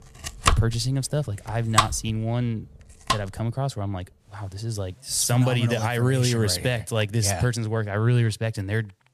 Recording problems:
household noises; loud; throughout; 1 dB below the speech

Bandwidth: 15 kHz